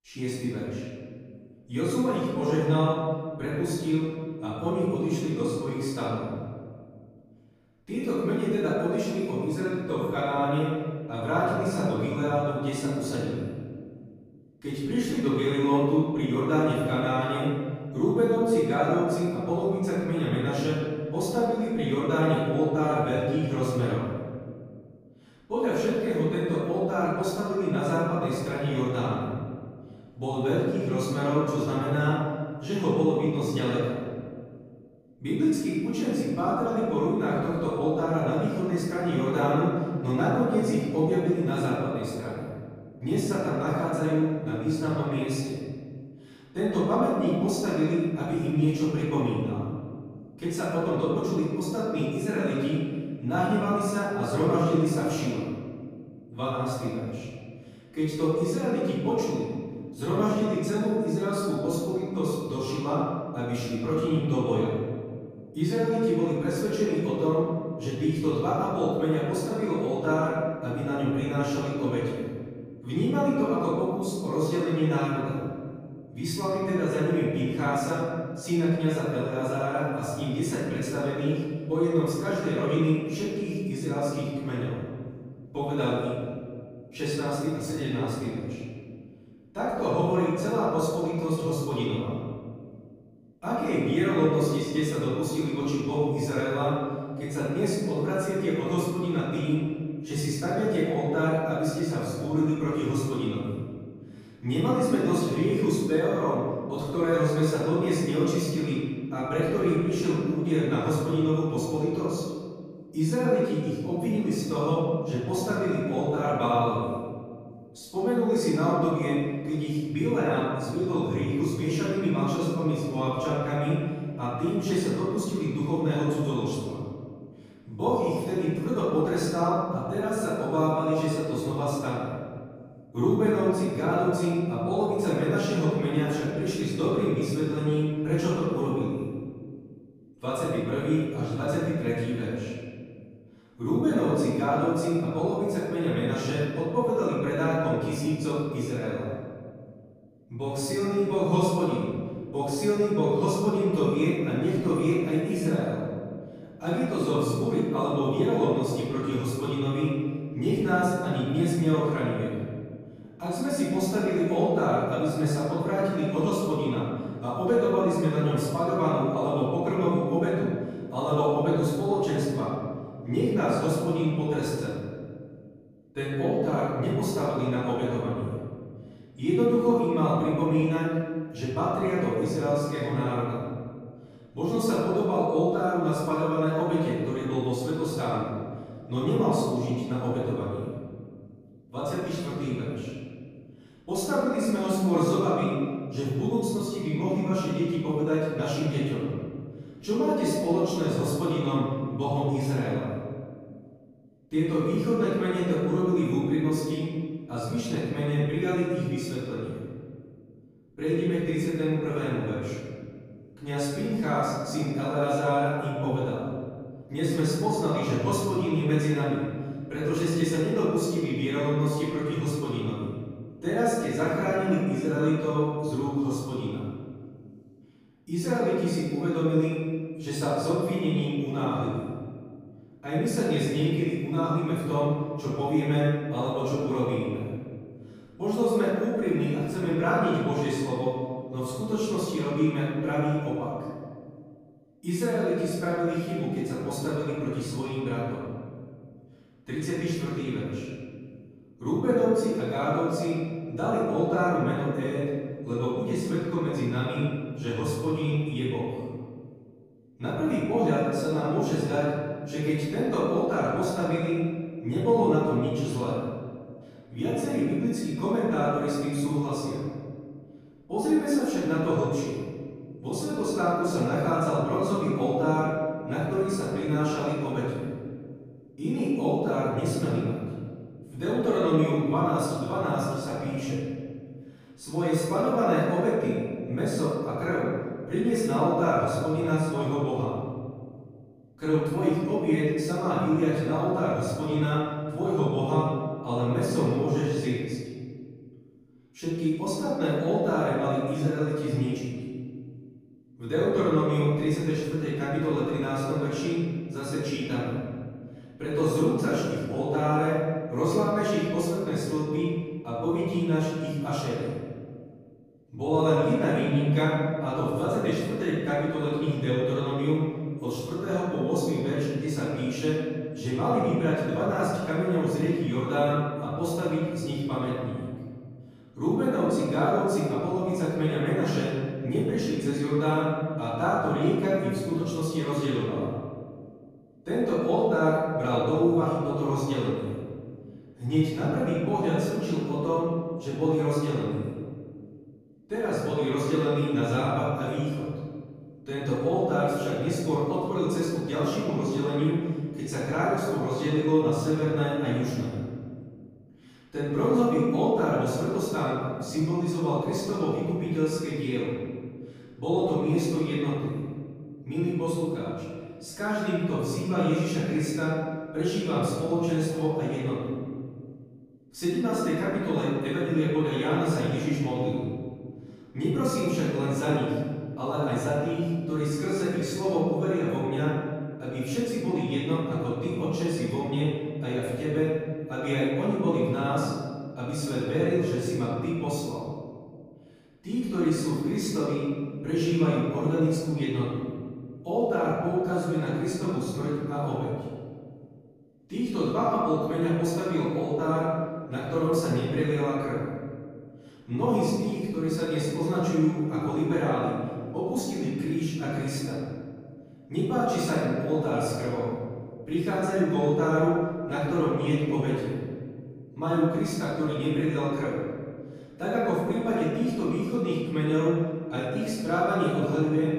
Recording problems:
room echo; strong; dies away in 1.9 s
off-mic speech; far

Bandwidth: 15 kHz